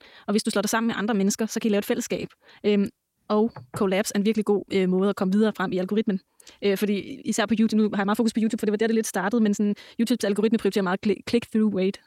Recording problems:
wrong speed, natural pitch; too fast; 1.5 times normal speed

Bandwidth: 16.5 kHz